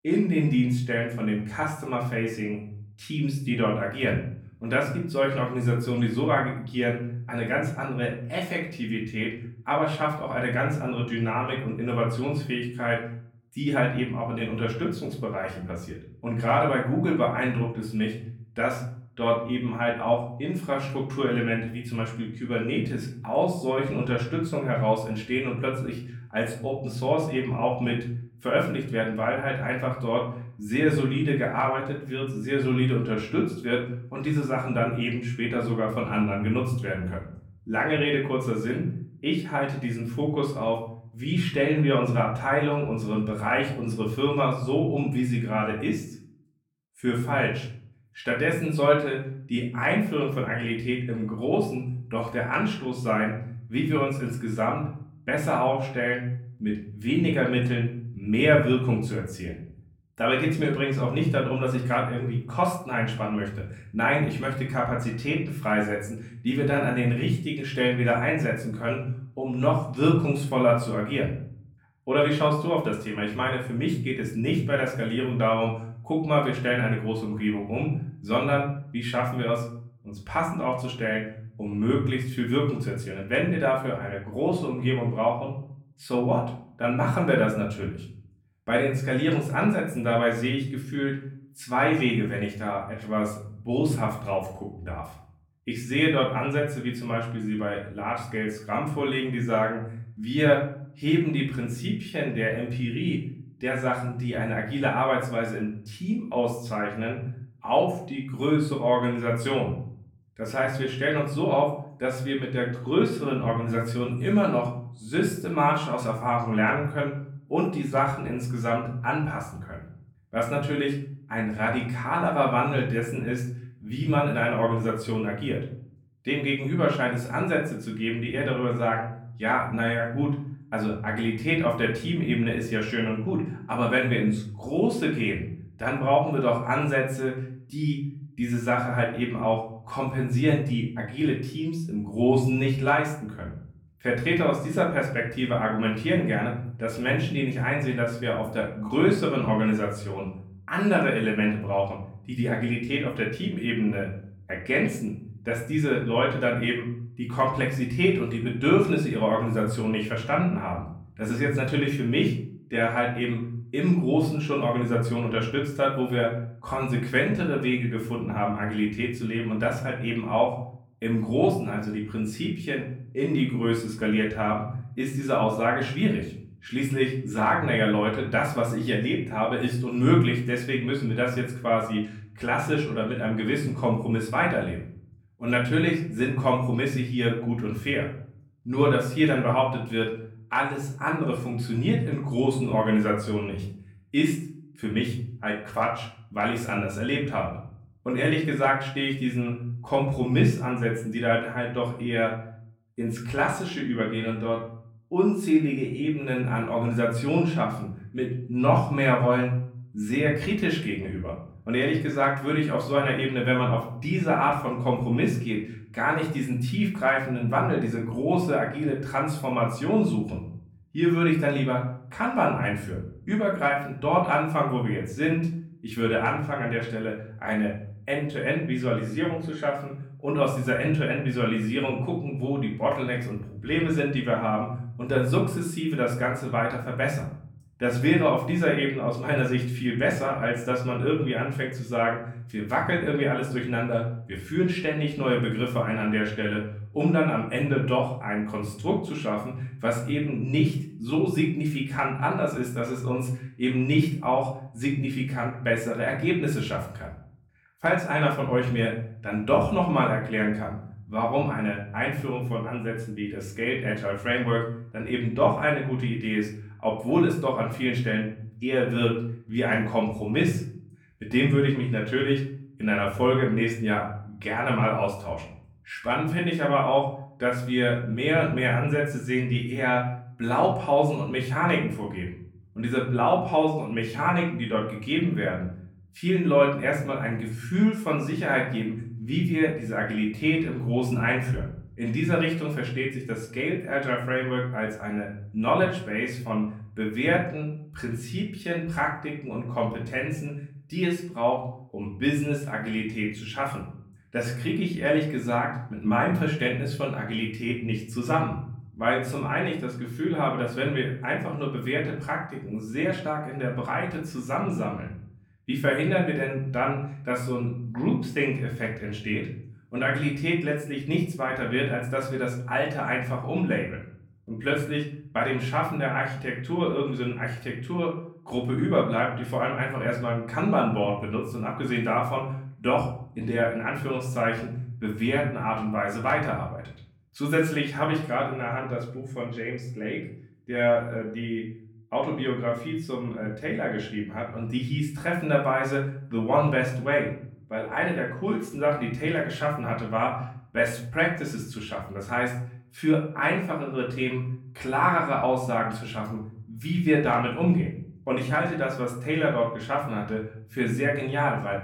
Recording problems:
off-mic speech; far
room echo; slight; dies away in 0.5 s

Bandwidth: 18 kHz